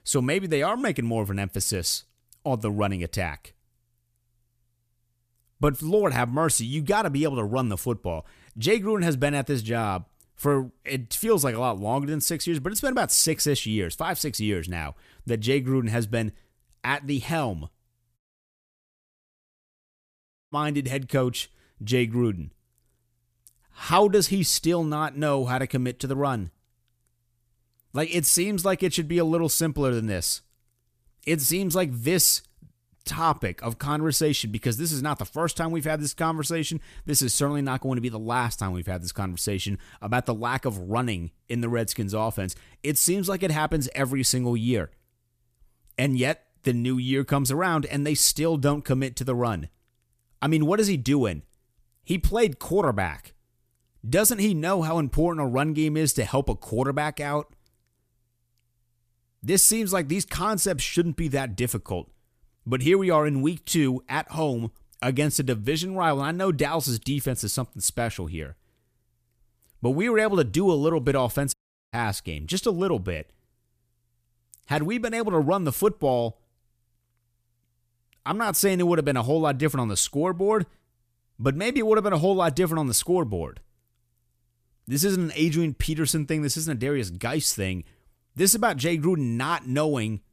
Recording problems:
audio cutting out; at 18 s for 2.5 s and at 1:12

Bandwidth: 14.5 kHz